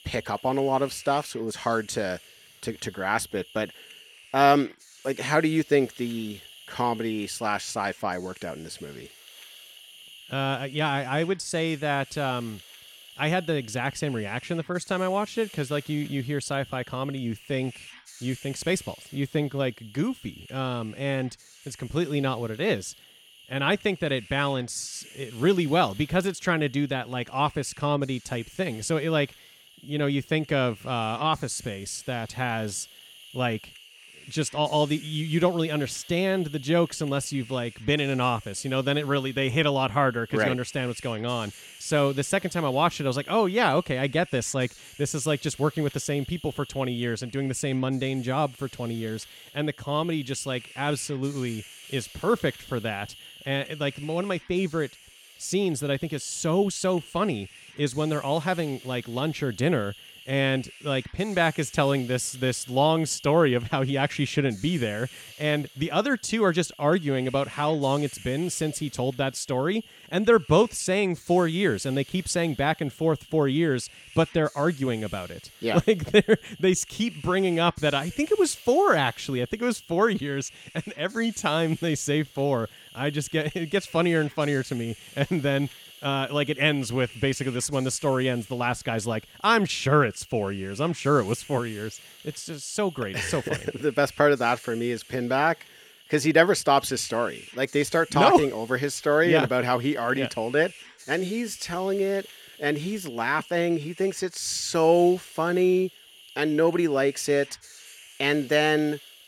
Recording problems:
hiss; noticeable; throughout; 20 dB below the speech

